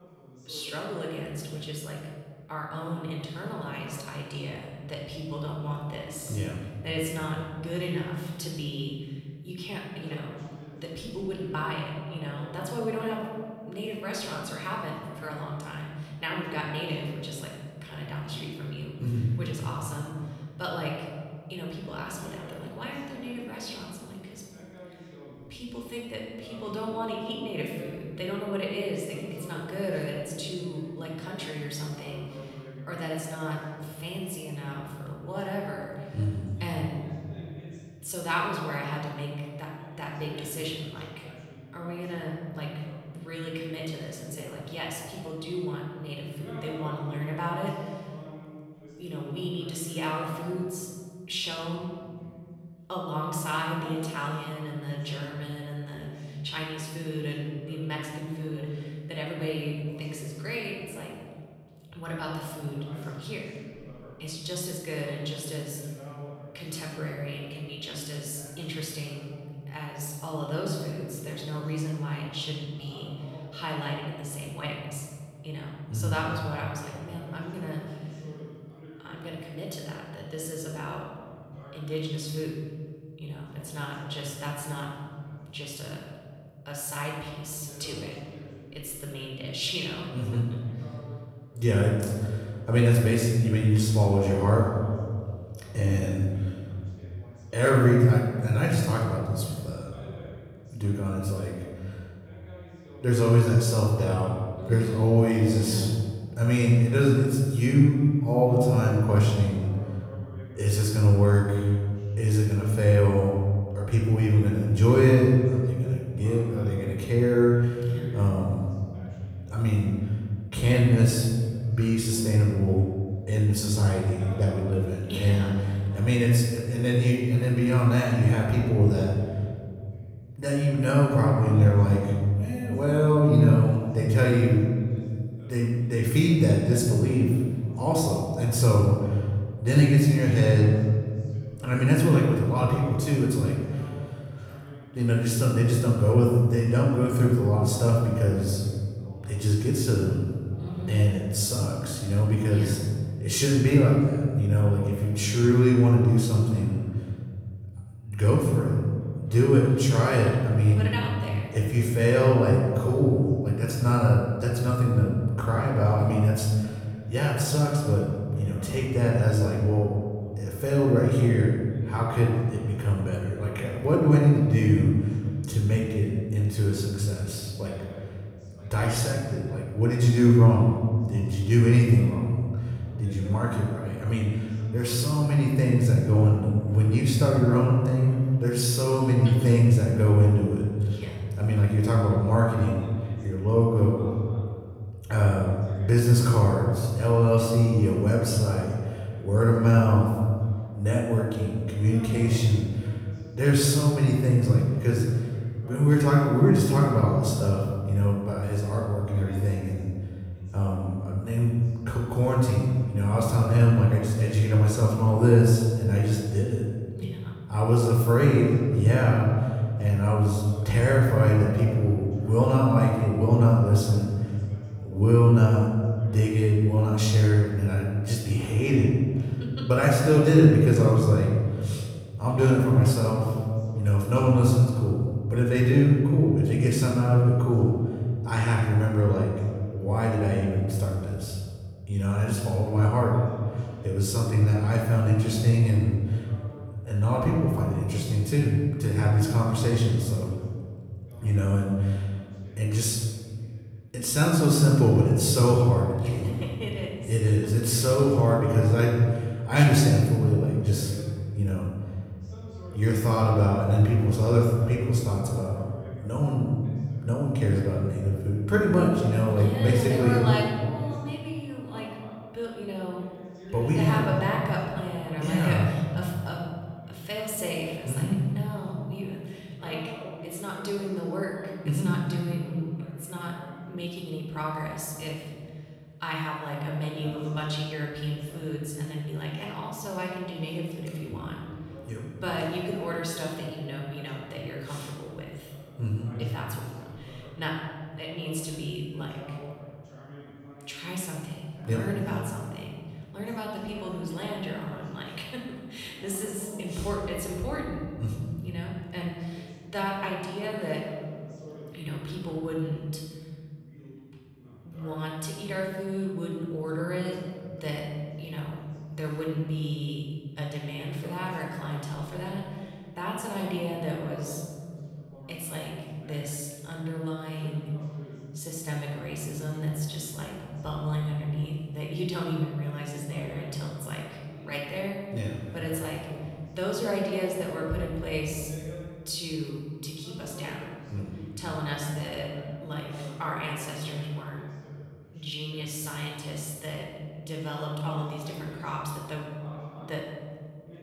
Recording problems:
room echo; noticeable; dies away in 2.1 s
off-mic speech; somewhat distant
voice in the background; faint; throughout; 25 dB below the speech

